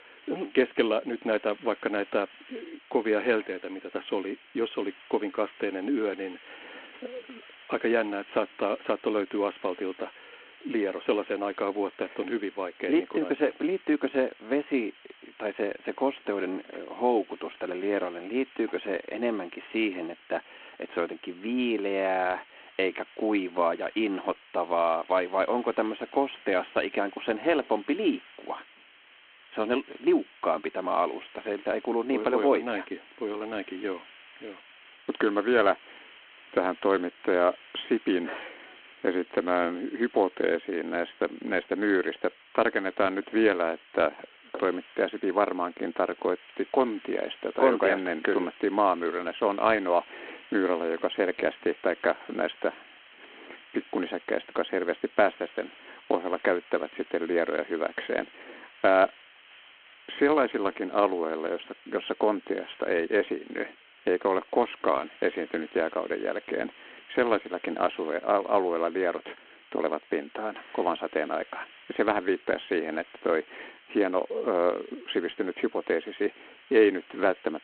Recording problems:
phone-call audio
hiss; faint; throughout; 20 dB below the speech

